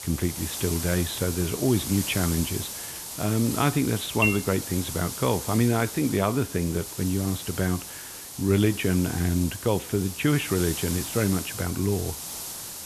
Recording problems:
high frequencies cut off; severe; nothing above 4 kHz
hiss; loud; throughout; 7 dB below the speech
clattering dishes; loud; at 4 s; peak 1 dB above the speech

